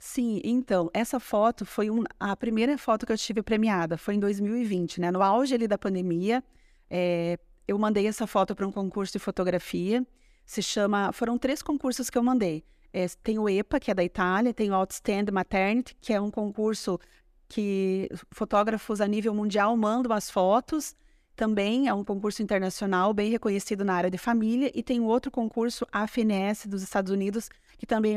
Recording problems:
abrupt cut into speech; at the end

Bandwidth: 14.5 kHz